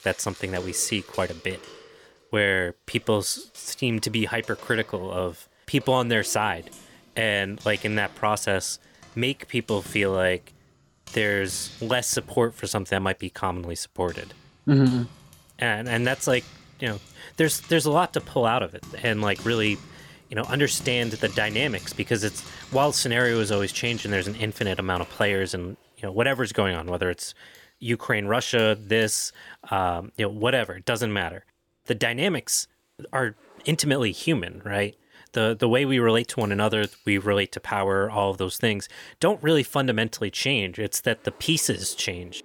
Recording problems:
household noises; noticeable; throughout; 20 dB below the speech

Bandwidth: 18 kHz